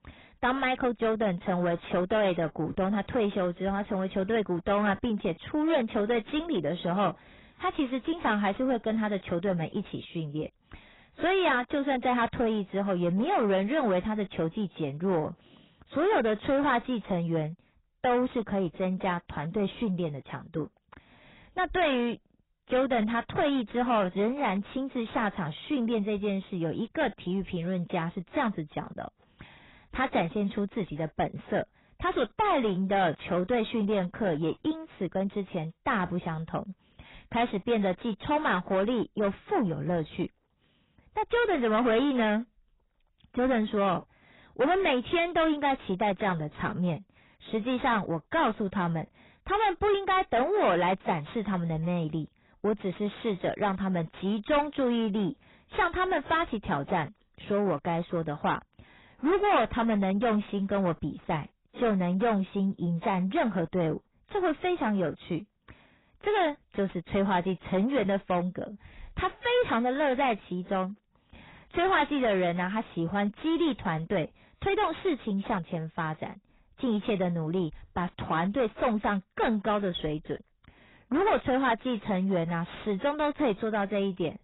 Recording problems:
distortion; heavy; 6 dB below the speech
garbled, watery; badly; nothing above 4 kHz

